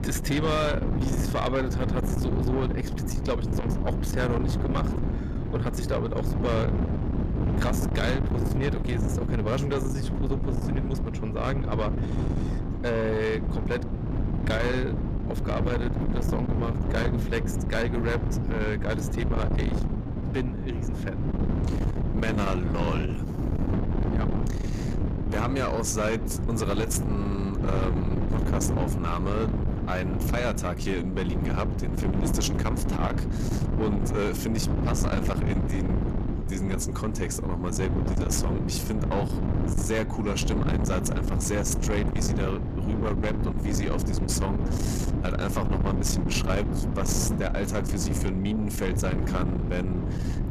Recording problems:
distortion; slight; 10 dB below the speech
wind noise on the microphone; heavy; 5 dB below the speech

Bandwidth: 14.5 kHz